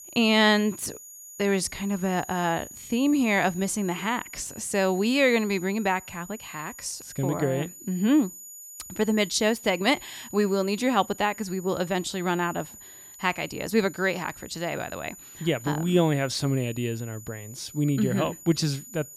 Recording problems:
high-pitched whine; noticeable; throughout; 7 kHz, 15 dB below the speech

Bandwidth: 17.5 kHz